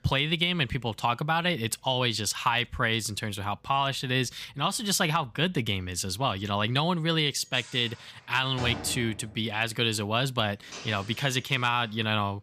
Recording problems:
household noises; noticeable; throughout; 15 dB below the speech

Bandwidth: 15 kHz